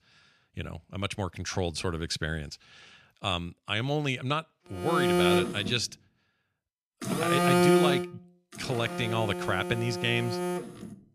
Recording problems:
alarms or sirens; very loud; from 5 s on; 2 dB above the speech

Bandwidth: 14 kHz